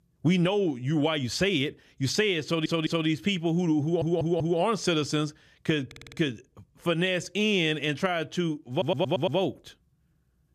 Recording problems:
audio stuttering; 4 times, first at 2.5 s

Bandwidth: 14.5 kHz